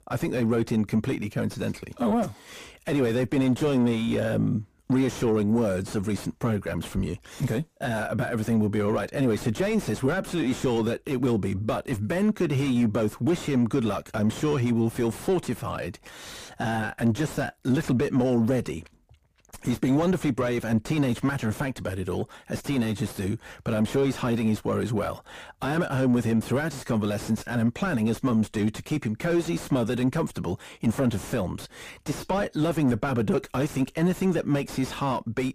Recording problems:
distortion; heavy; 7 dB below the speech

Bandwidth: 15 kHz